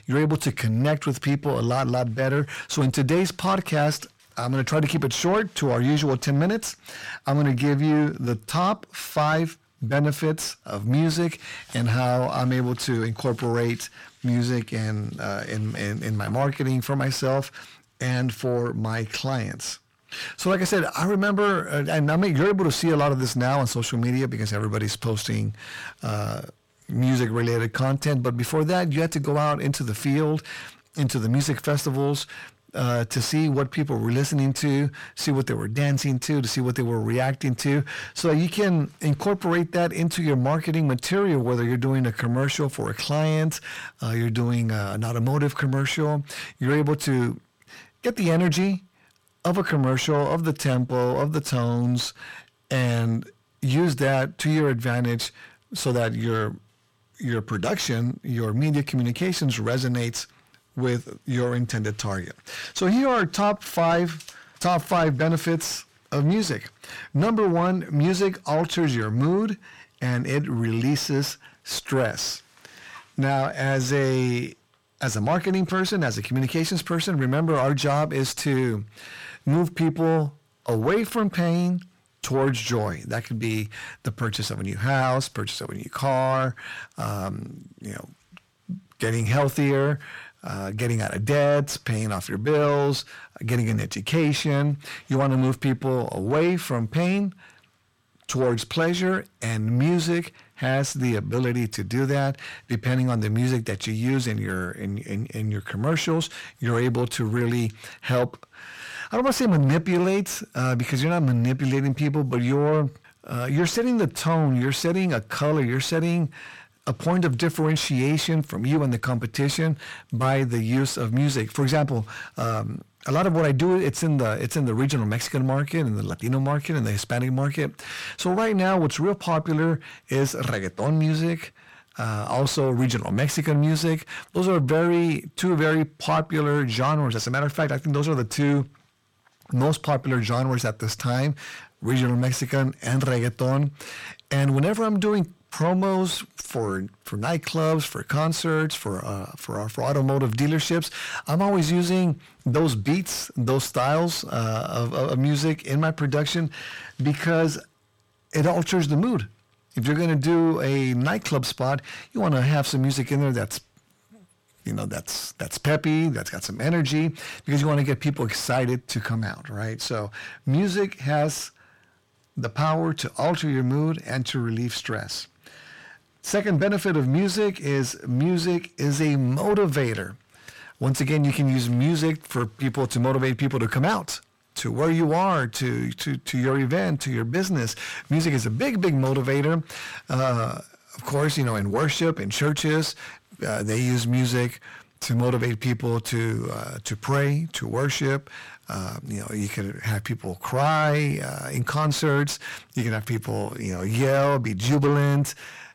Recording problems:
distortion; slight; 10 dB below the speech

